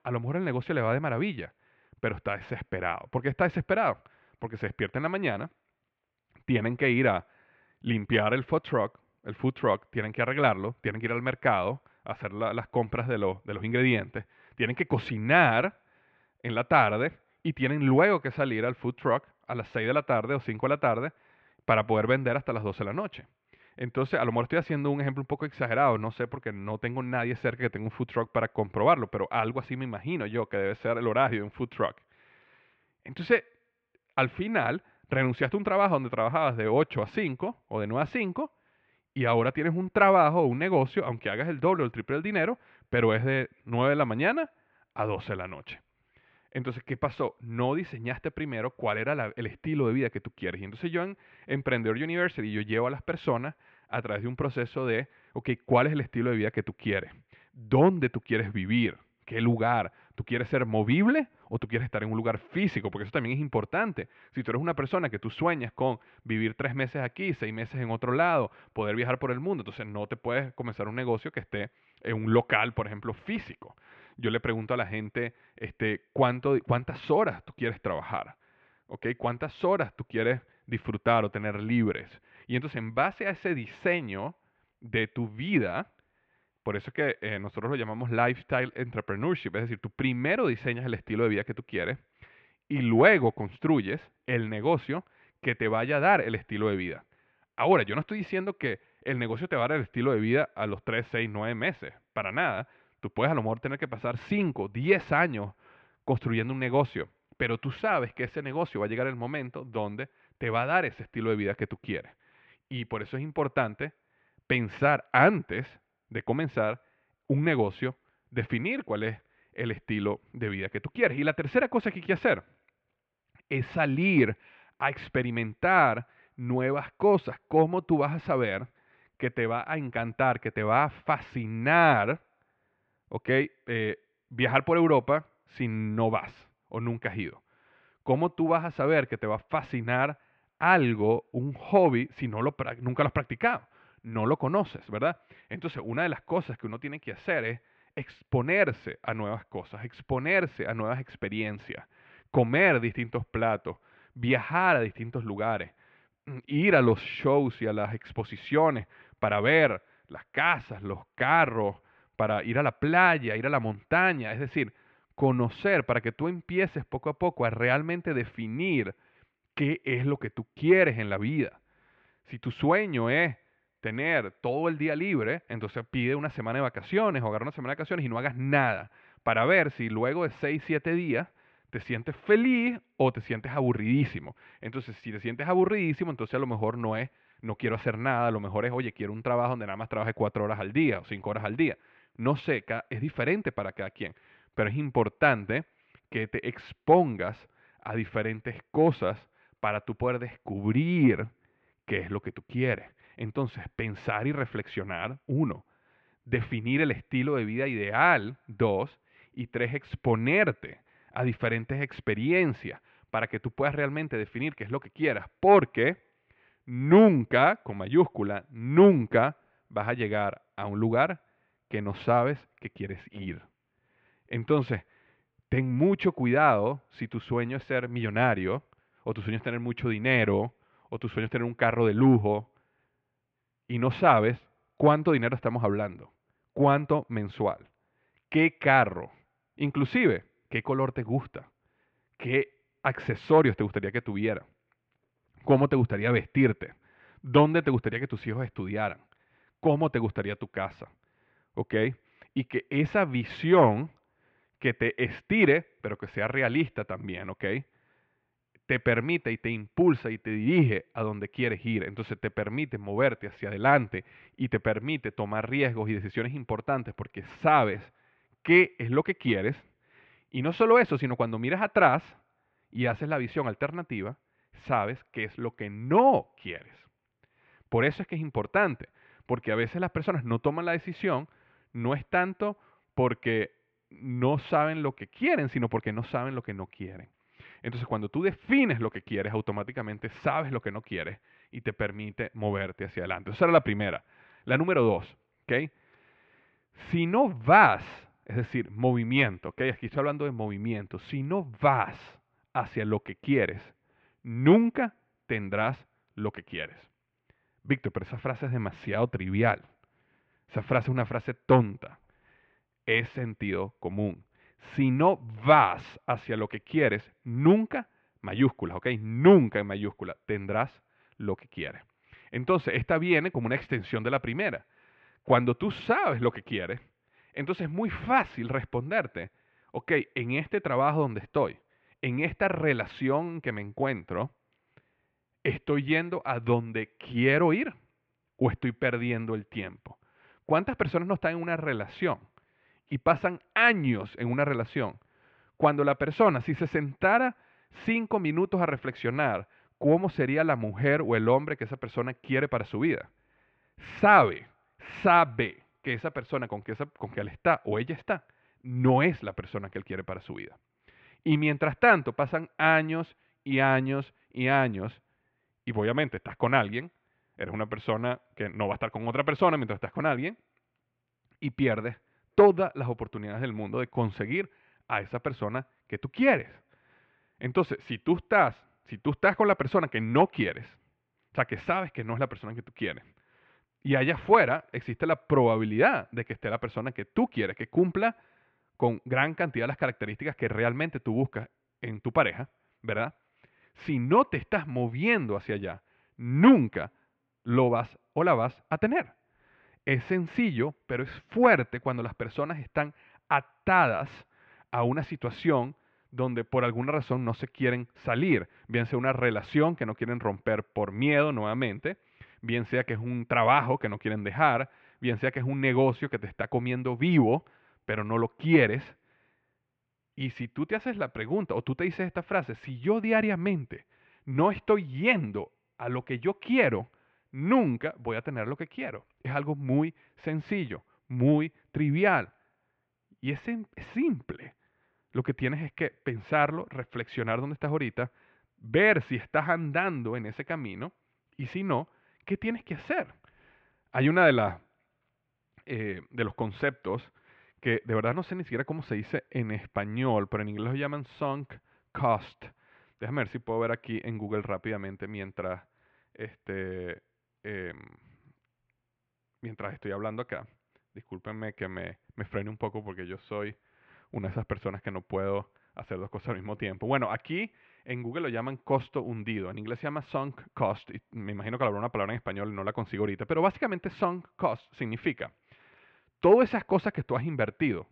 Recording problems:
muffled; very; fading above 2.5 kHz

